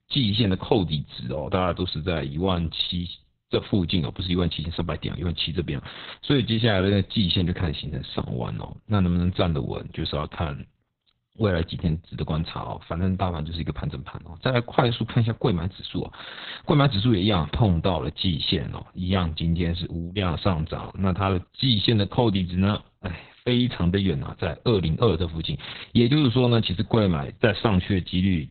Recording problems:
garbled, watery; badly; nothing above 4 kHz

